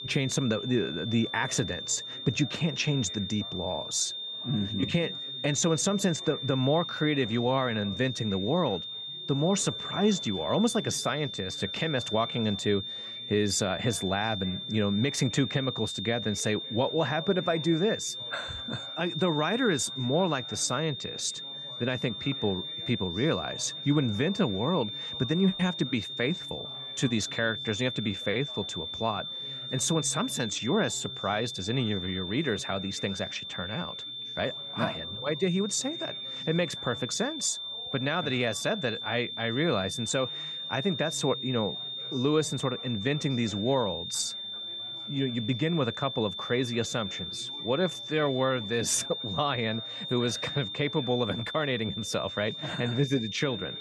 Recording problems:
high-pitched whine; loud; throughout; 3.5 kHz, 6 dB below the speech
background chatter; faint; throughout; 4 voices, 25 dB below the speech

